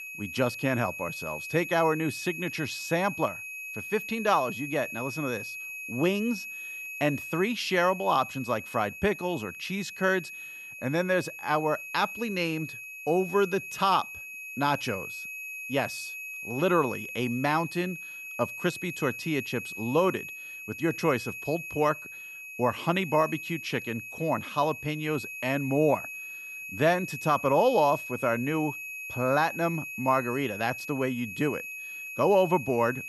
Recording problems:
high-pitched whine; loud; throughout; 2.5 kHz, 9 dB below the speech

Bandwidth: 15 kHz